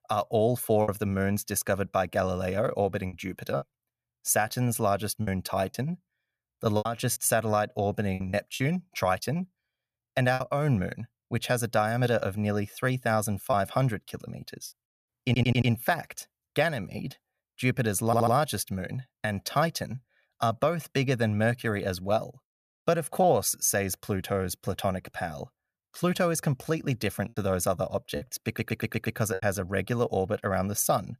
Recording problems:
choppy; occasionally; 4% of the speech affected
audio stuttering; at 15 s, at 18 s and at 28 s

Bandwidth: 14.5 kHz